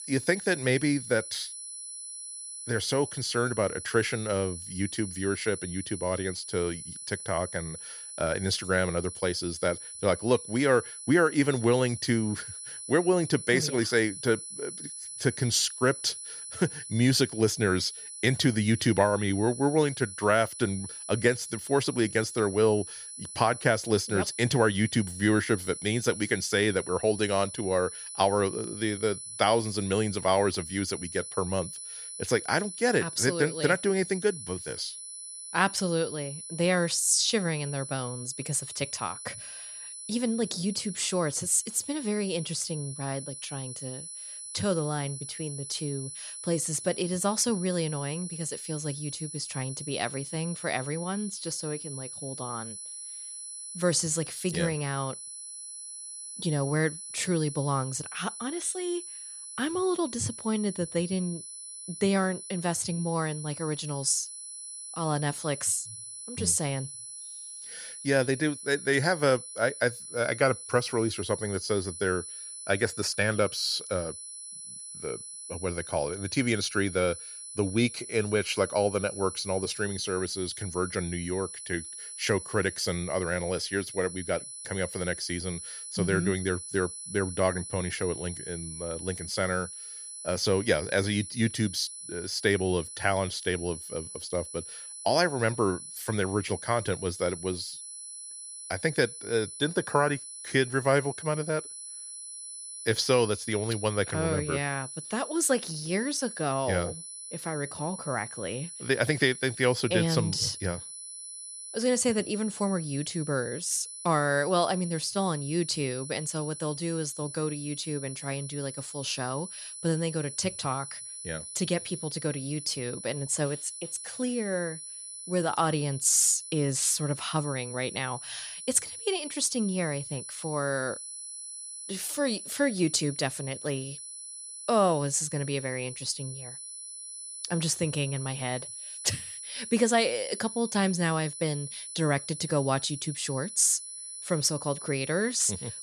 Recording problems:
high-pitched whine; loud; throughout; 10 kHz, 10 dB below the speech

